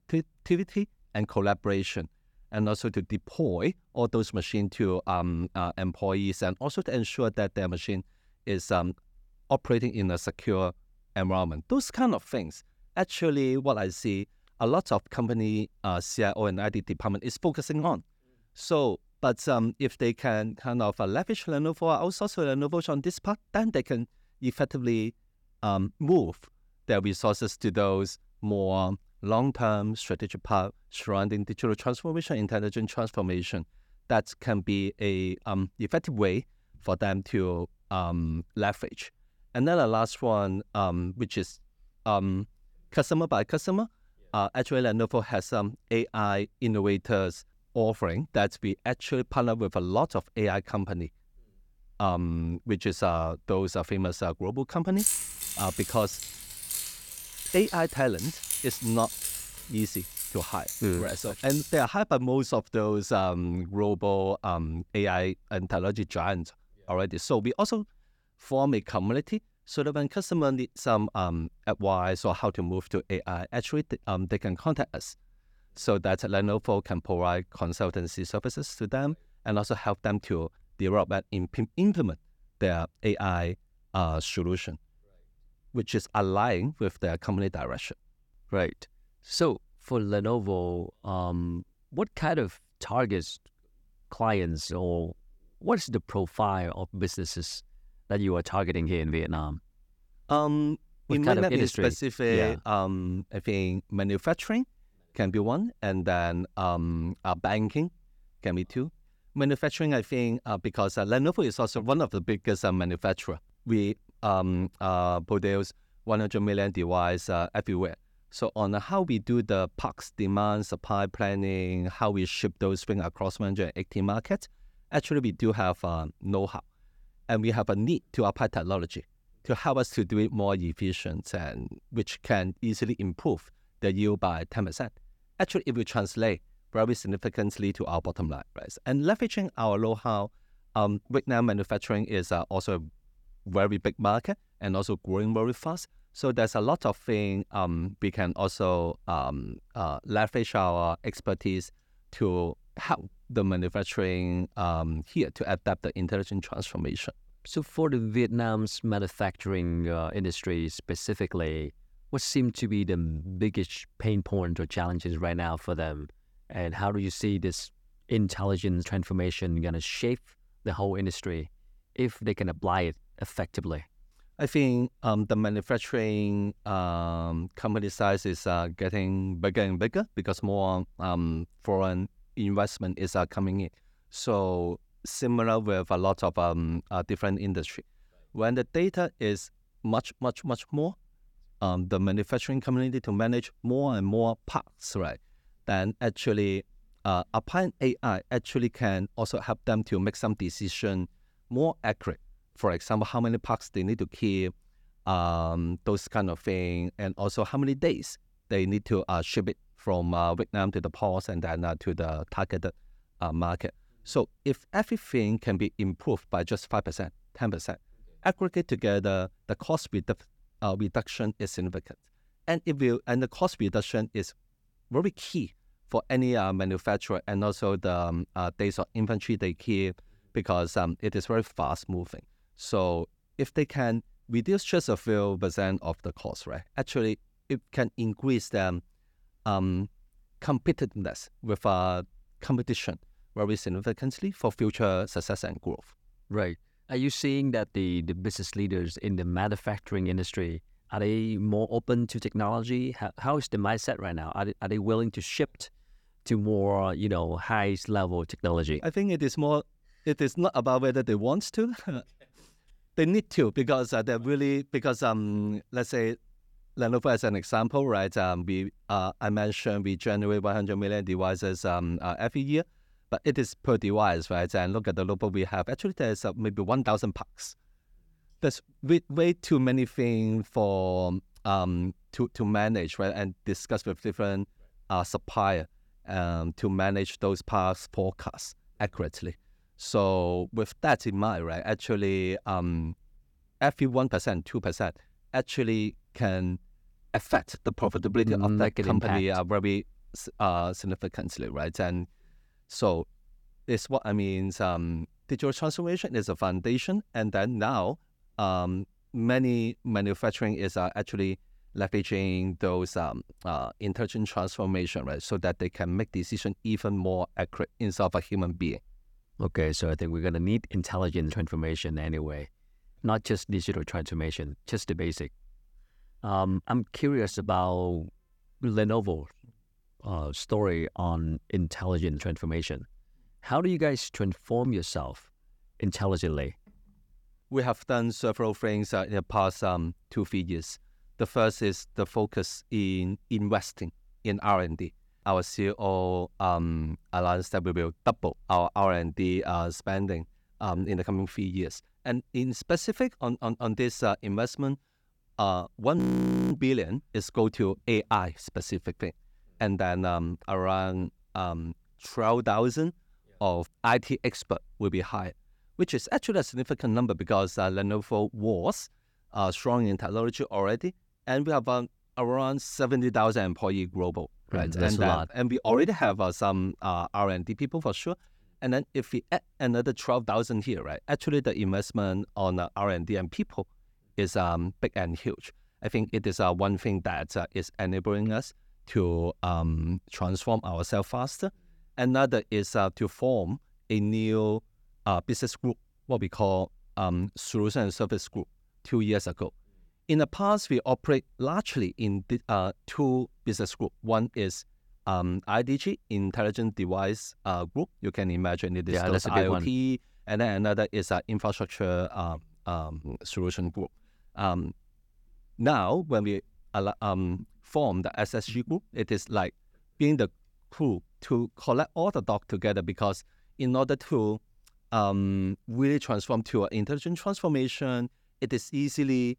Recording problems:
jangling keys; loud; from 55 s to 1:02; peak 3 dB above the speech
audio freezing; at 5:56 for 0.5 s

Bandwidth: 18 kHz